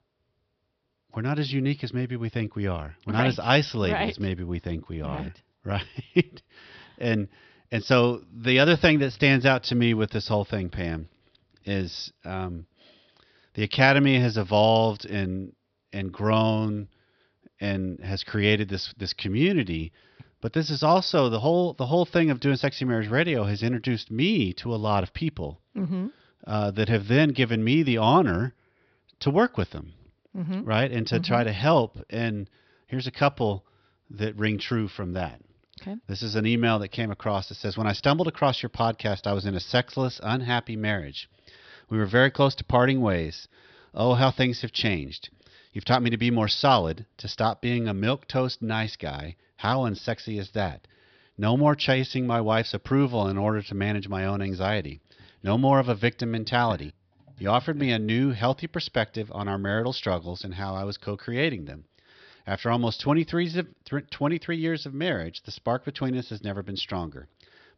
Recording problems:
high frequencies cut off; noticeable; nothing above 5.5 kHz

